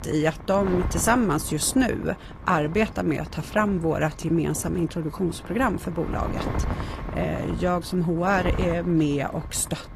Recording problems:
garbled, watery; slightly; nothing above 14 kHz
wind noise on the microphone; occasional gusts; 15 dB below the speech

